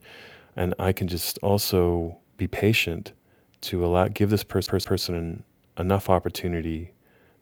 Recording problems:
audio stuttering; at 4.5 s

